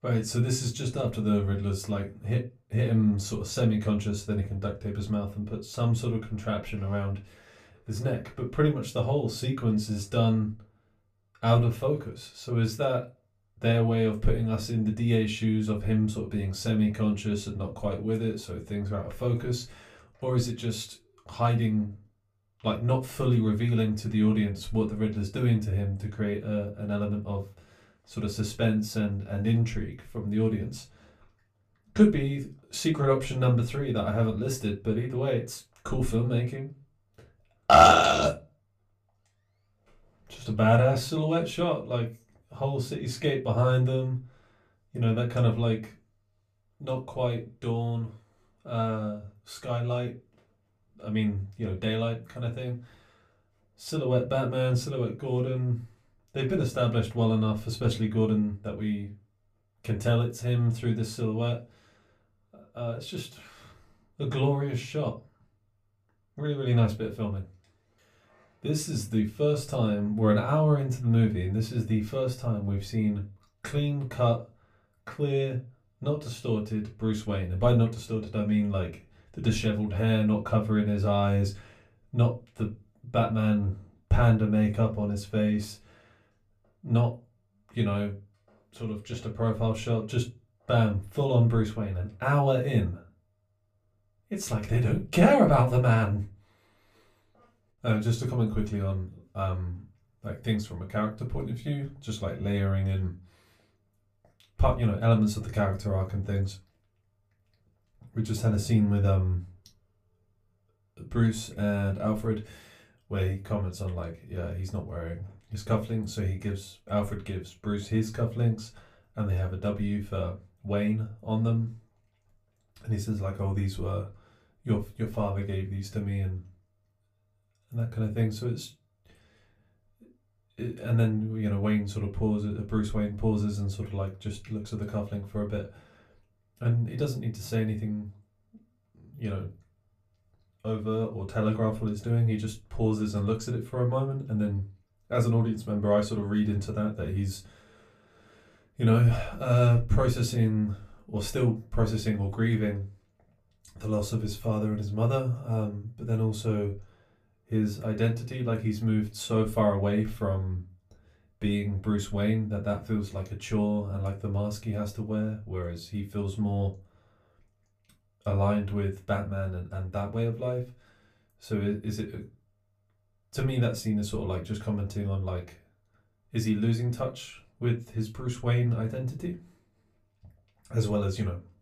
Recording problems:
off-mic speech; far
room echo; very slight; dies away in 0.2 s

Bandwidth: 15 kHz